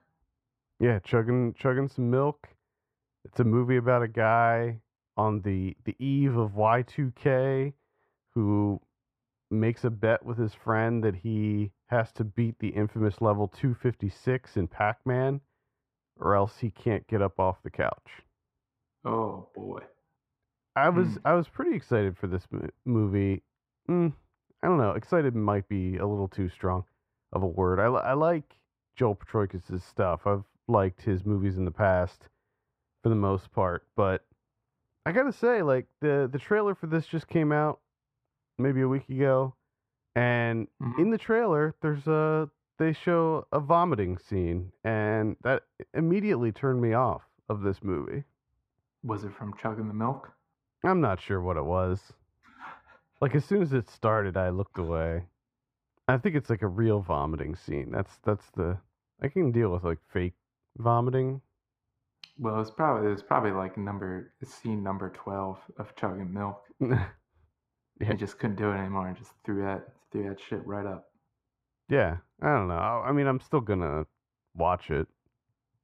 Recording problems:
muffled; very; fading above 3 kHz

